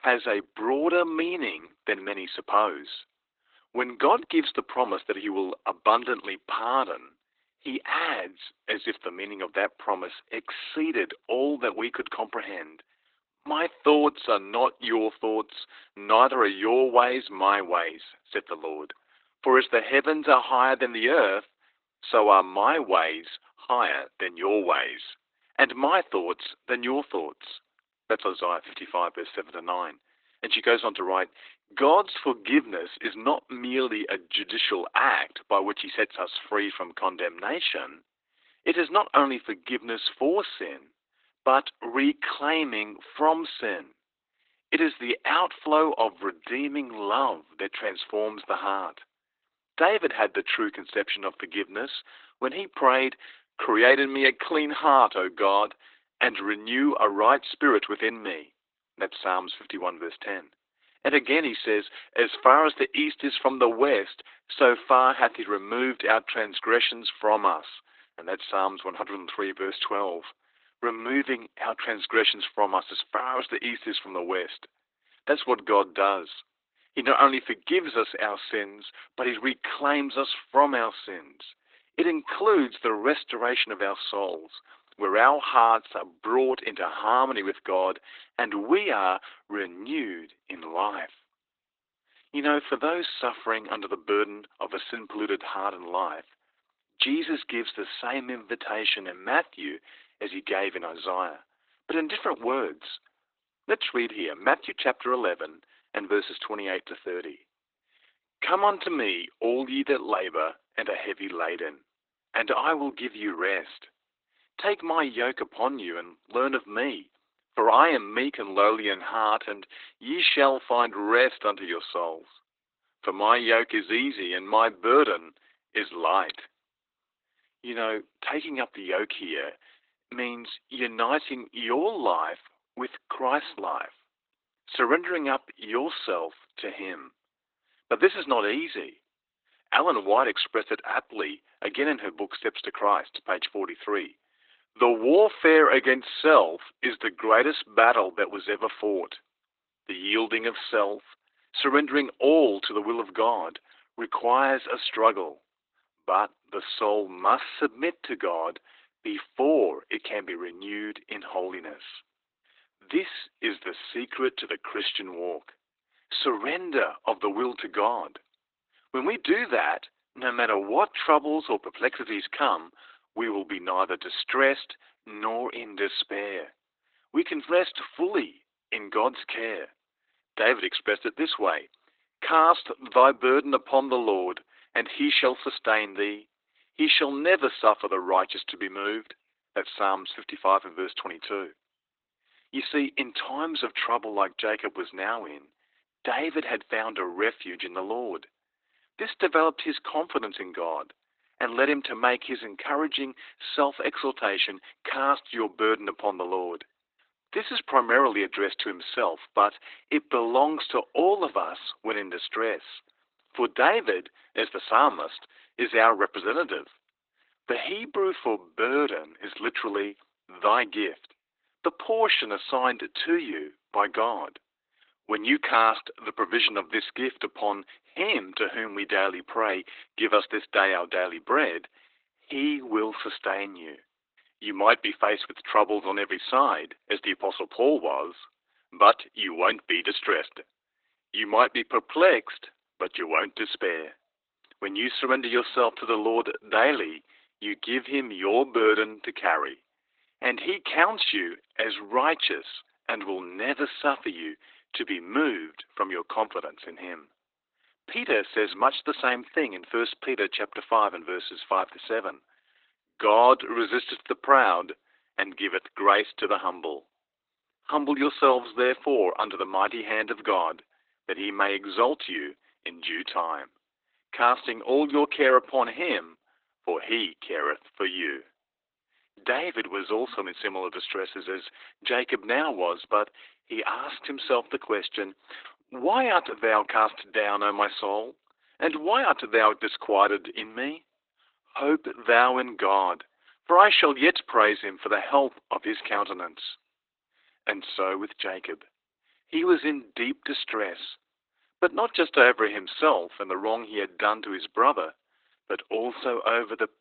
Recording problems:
garbled, watery; badly; nothing above 4 kHz
thin; very; fading below 300 Hz

